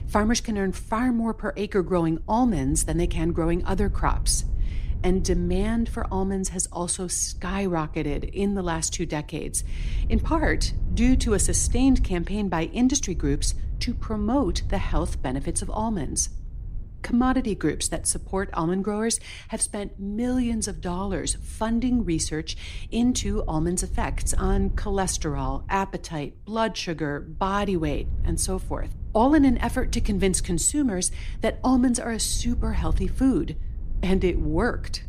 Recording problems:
wind noise on the microphone; occasional gusts; 25 dB below the speech

